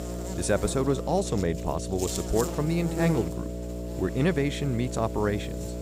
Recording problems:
electrical hum; loud; throughout; 60 Hz, 7 dB below the speech

